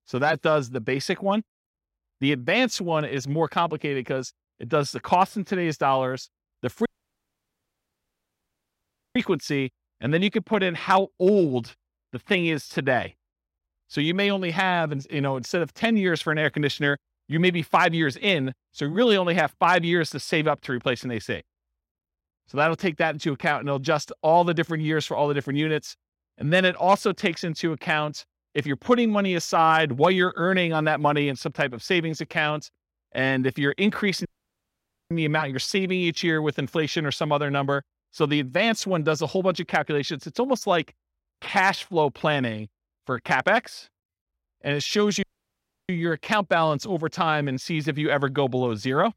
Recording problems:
audio cutting out; at 7 s for 2.5 s, at 34 s for 1 s and at 45 s for 0.5 s

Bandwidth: 16 kHz